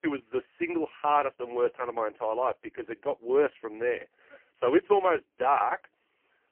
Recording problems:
phone-call audio; poor line; nothing above 3 kHz

